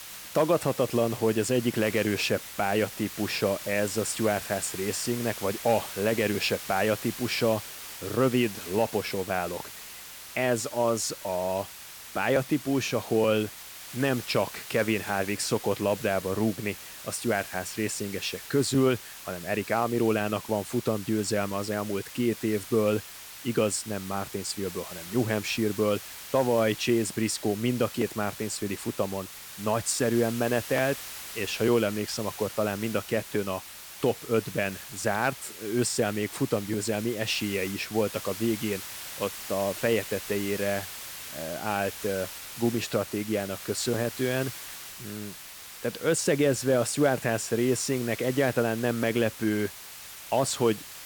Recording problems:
hiss; noticeable; throughout; 10 dB below the speech

